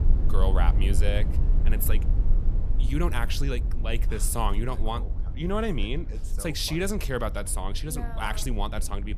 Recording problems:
low rumble; noticeable; throughout; 15 dB below the speech

